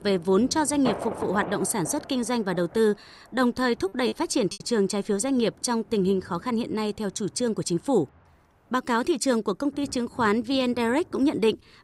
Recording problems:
rain or running water; noticeable; throughout; 15 dB below the speech
choppy; very; at 4 s; 5% of the speech affected

